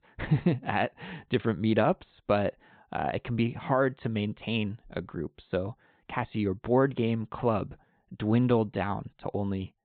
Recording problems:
high frequencies cut off; severe; nothing above 4 kHz

